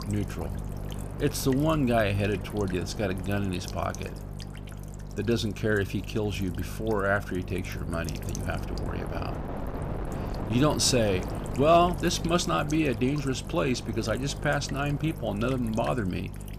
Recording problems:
electrical hum; noticeable; throughout; 50 Hz, 20 dB below the speech
wind noise on the microphone; occasional gusts; 15 dB below the speech

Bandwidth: 14.5 kHz